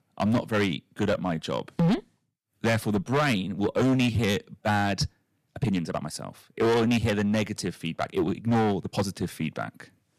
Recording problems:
distortion; heavy; 10% of the sound clipped
uneven, jittery; strongly; from 1 to 9 s

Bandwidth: 14.5 kHz